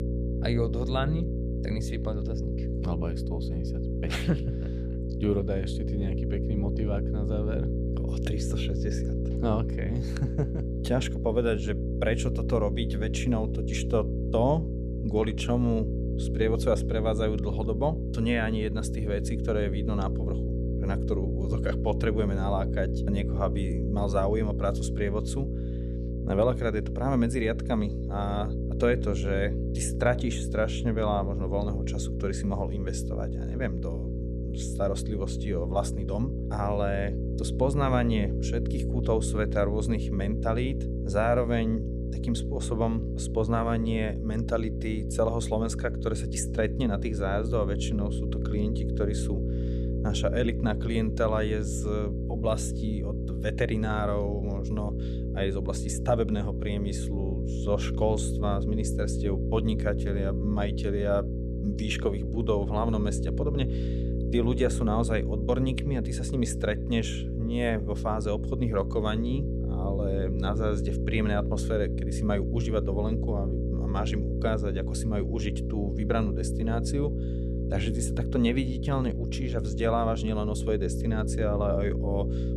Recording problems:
electrical hum; loud; throughout; 60 Hz, 7 dB below the speech

